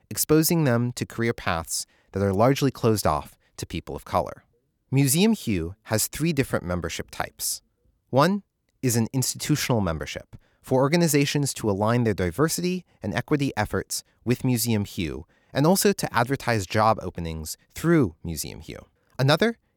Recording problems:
none

